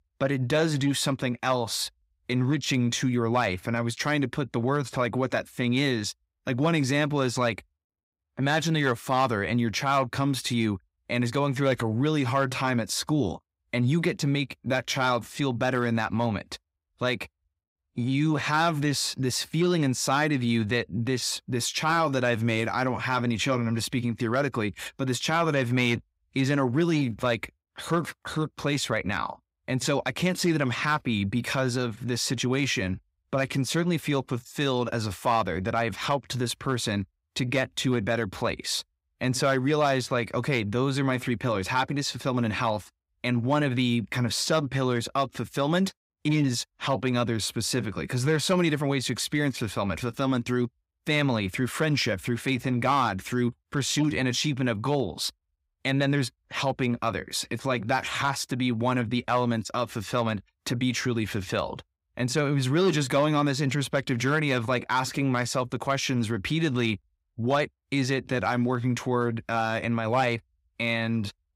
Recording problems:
none

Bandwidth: 15.5 kHz